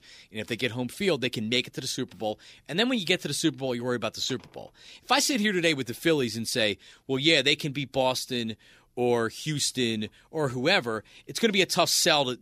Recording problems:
none

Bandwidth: 15 kHz